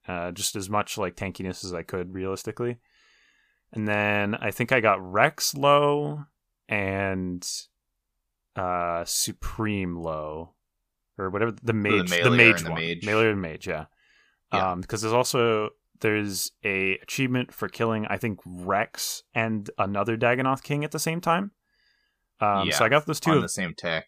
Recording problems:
none

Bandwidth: 15 kHz